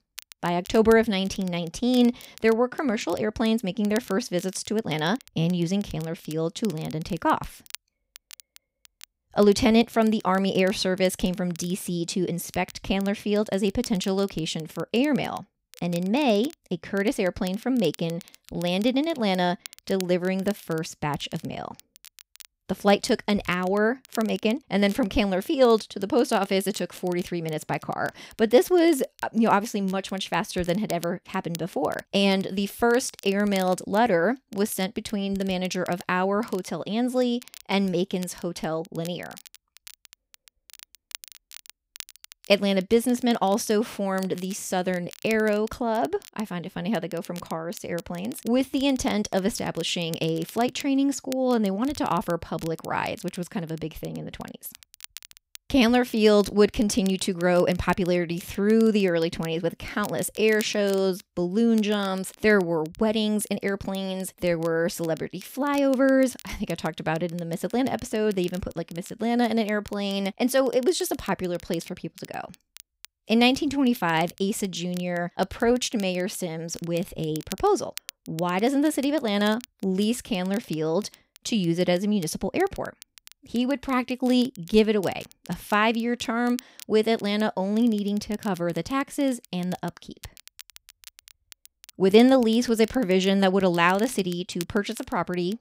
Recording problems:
crackle, like an old record; faint; 20 dB below the speech

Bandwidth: 15.5 kHz